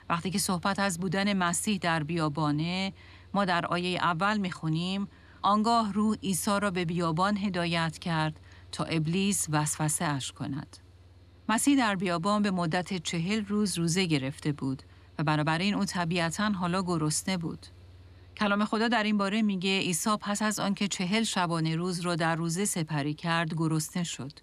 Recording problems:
machinery noise; faint; throughout; 25 dB below the speech

